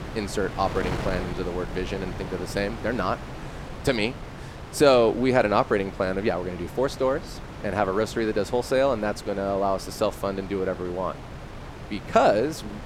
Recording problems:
wind noise on the microphone; occasional gusts; 15 dB below the speech

